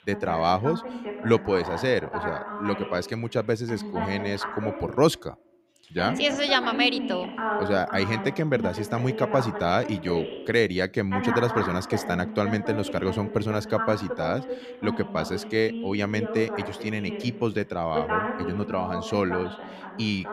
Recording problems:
voice in the background; loud; throughout; 6 dB below the speech

